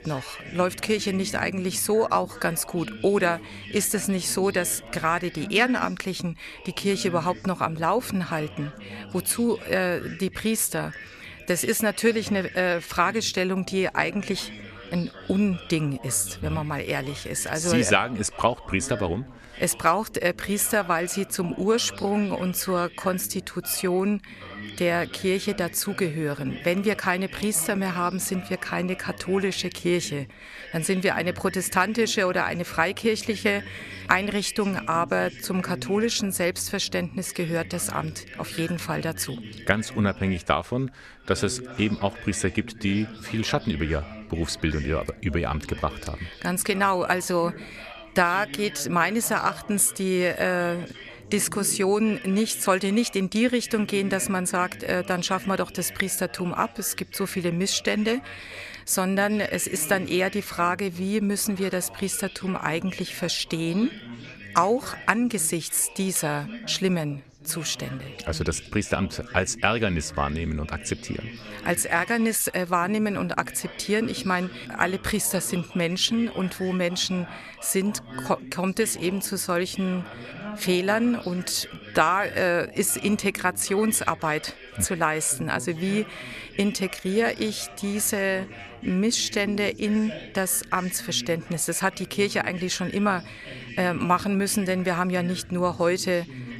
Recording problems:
background chatter; noticeable; throughout; 3 voices, 15 dB below the speech

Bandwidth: 13.5 kHz